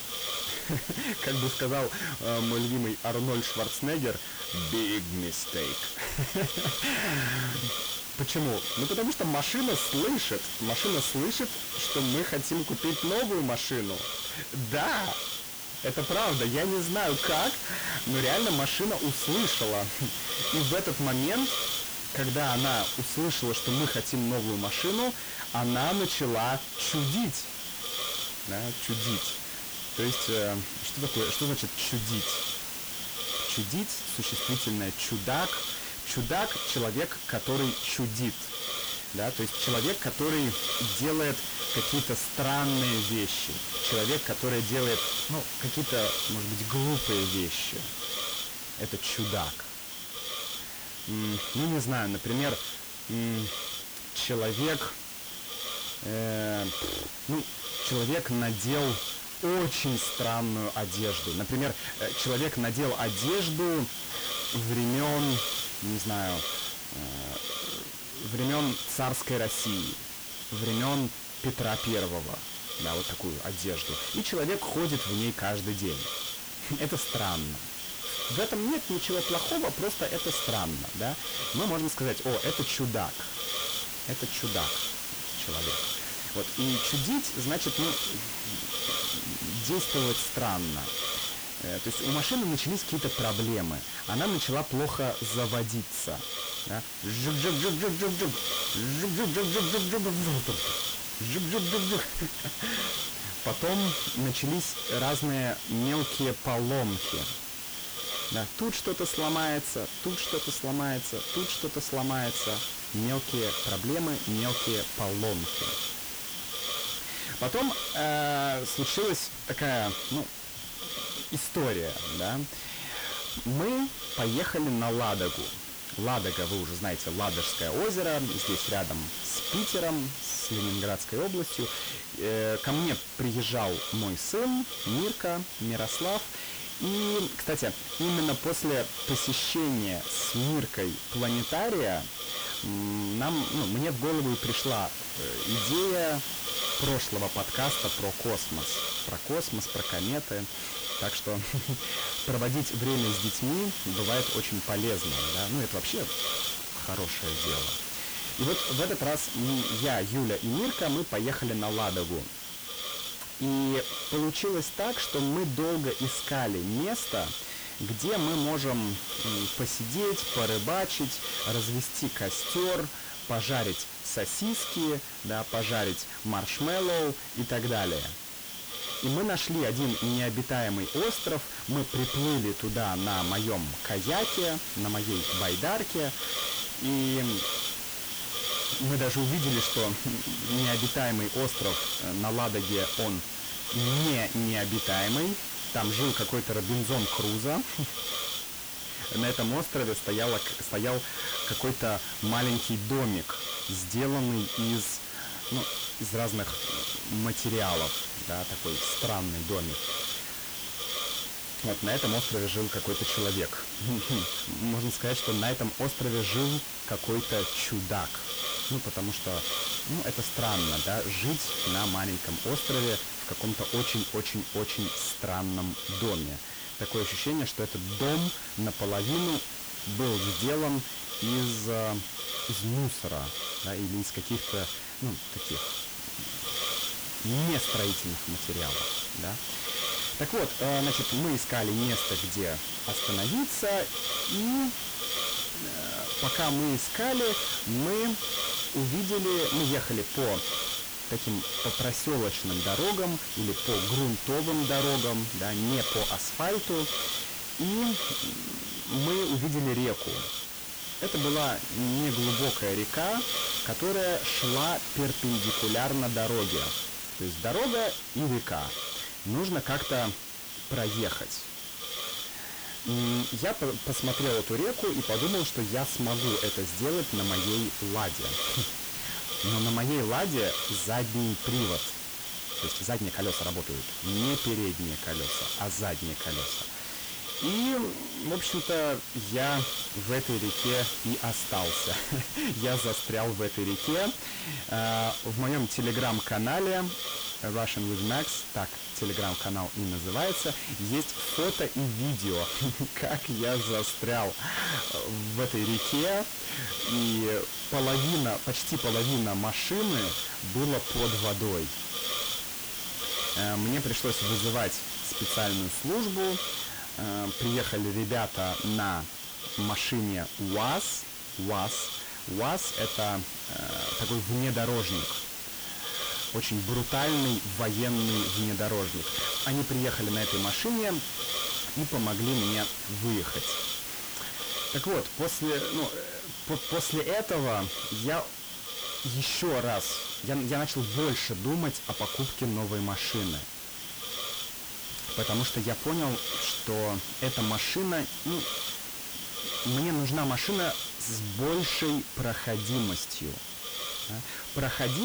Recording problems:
distortion; heavy; 6 dB below the speech
hiss; loud; throughout; as loud as the speech
uneven, jittery; strongly; from 6 s to 5:09
abrupt cut into speech; at the end

